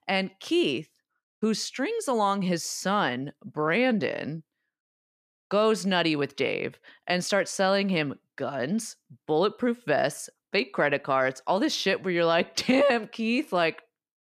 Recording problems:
none

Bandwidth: 14.5 kHz